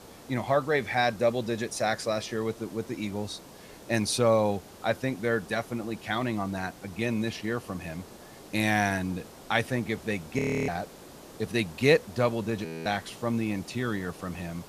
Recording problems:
hiss; noticeable; throughout; 20 dB below the speech
audio freezing; at 10 s and at 13 s

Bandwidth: 14.5 kHz